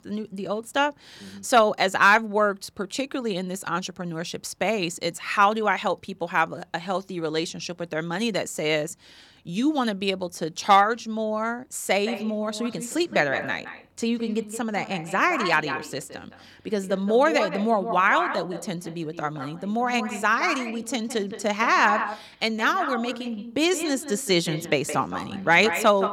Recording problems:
echo of what is said; strong; from 12 s on; 170 ms later, 9 dB below the speech

